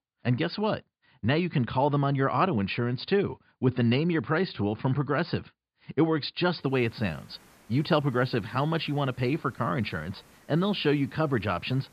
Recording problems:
high frequencies cut off; severe; nothing above 5 kHz
hiss; faint; from 6.5 s on; 30 dB below the speech

